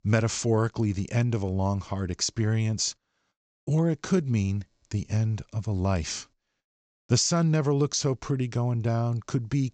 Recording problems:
high frequencies cut off; noticeable; nothing above 8 kHz

